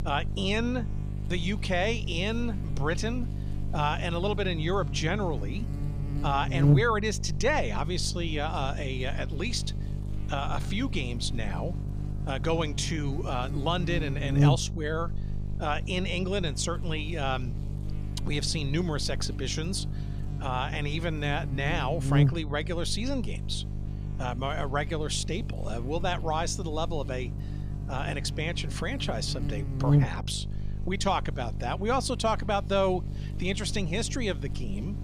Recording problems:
electrical hum; noticeable; throughout; 50 Hz, 10 dB below the speech

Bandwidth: 14.5 kHz